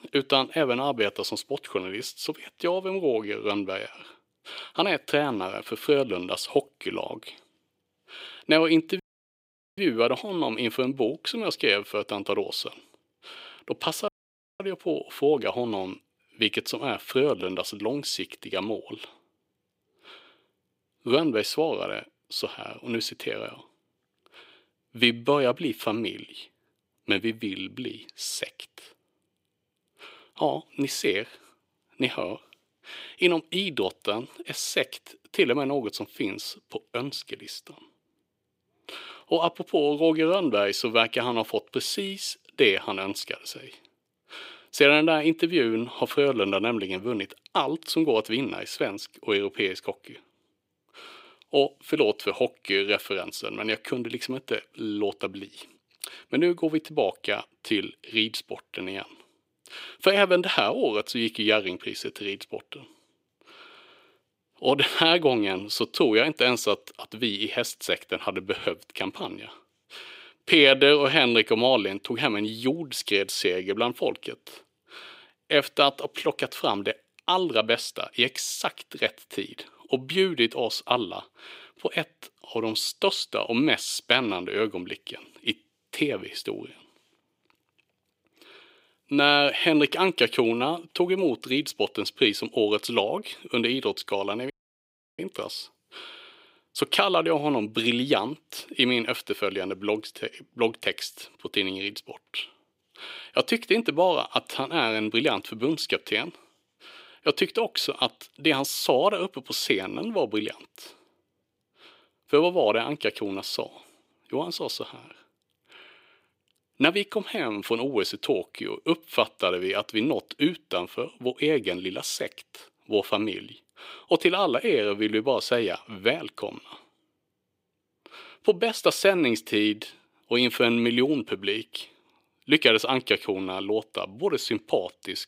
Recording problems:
thin; somewhat; fading below 350 Hz
audio cutting out; at 9 s for 1 s, at 14 s for 0.5 s and at 1:35 for 0.5 s

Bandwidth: 15.5 kHz